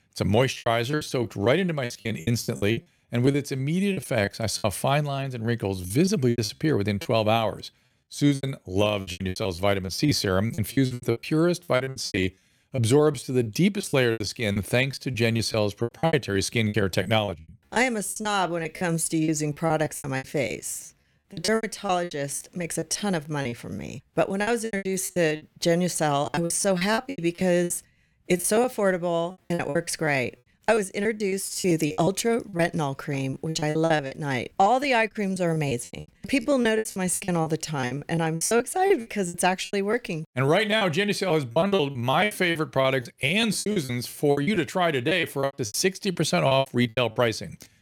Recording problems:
choppy; very; 18% of the speech affected

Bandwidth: 17.5 kHz